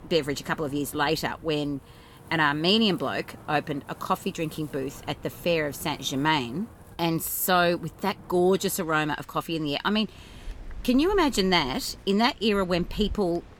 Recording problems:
wind in the background; faint; throughout; 20 dB below the speech

